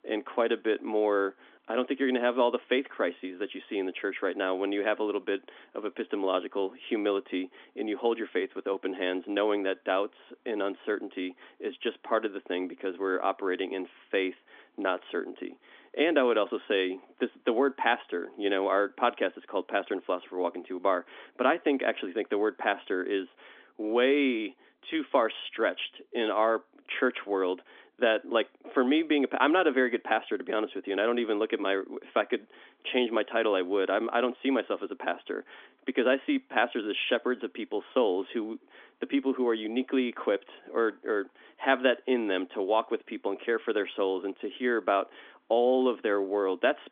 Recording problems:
phone-call audio; nothing above 3.5 kHz

